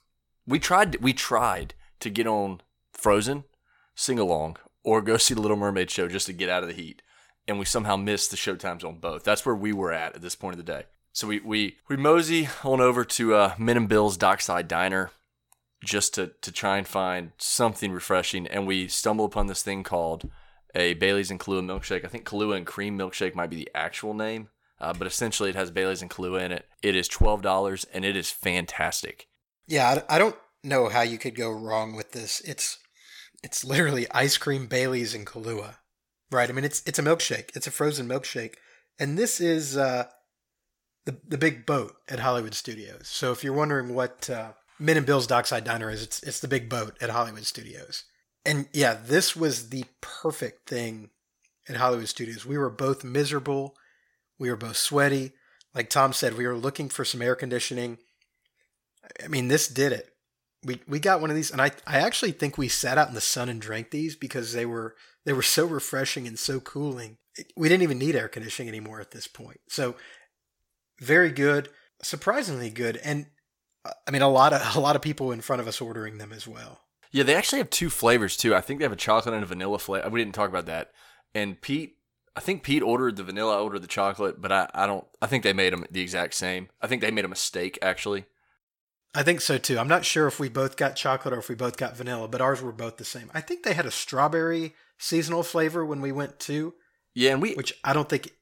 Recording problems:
none

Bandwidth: 17 kHz